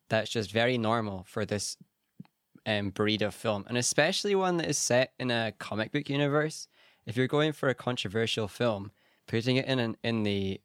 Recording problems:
none

